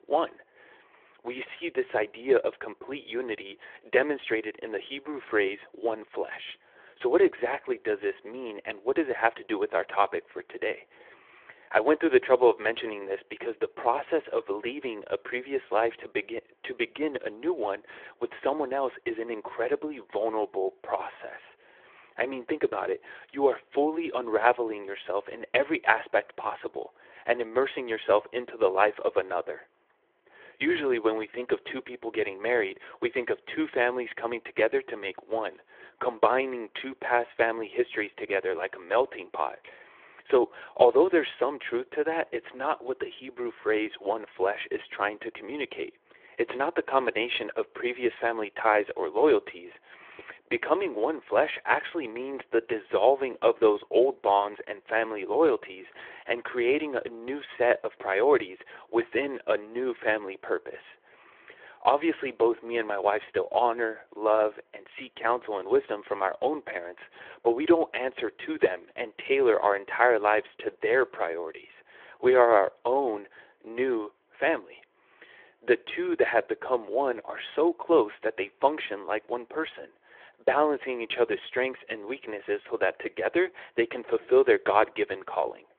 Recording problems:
phone-call audio; nothing above 3.5 kHz

